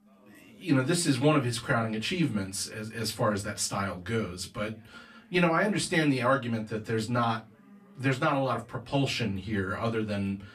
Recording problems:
off-mic speech; far
room echo; very slight; dies away in 0.2 s
background chatter; faint; throughout; 4 voices, 30 dB below the speech

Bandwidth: 14.5 kHz